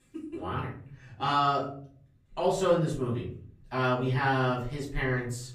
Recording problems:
off-mic speech; far
room echo; slight; dies away in 0.5 s

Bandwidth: 15 kHz